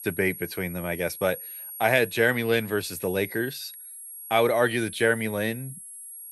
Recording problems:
high-pitched whine; noticeable; throughout; 11.5 kHz, 15 dB below the speech

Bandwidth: 14.5 kHz